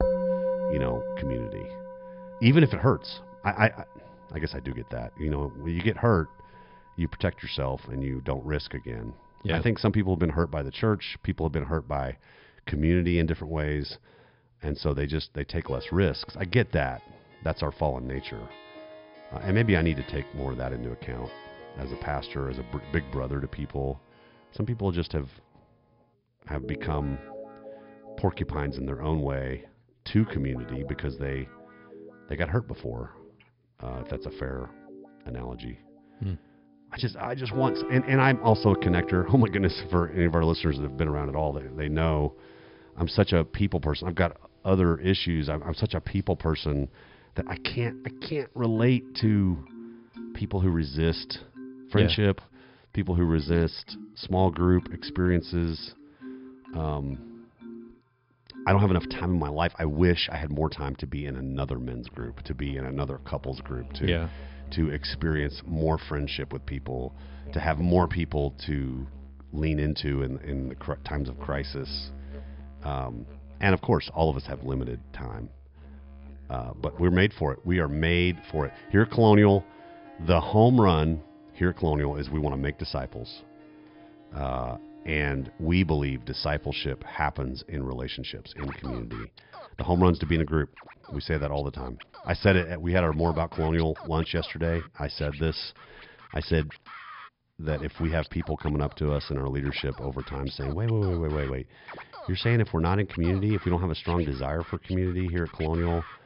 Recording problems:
high frequencies cut off; noticeable; nothing above 5.5 kHz
background music; noticeable; throughout; 15 dB below the speech

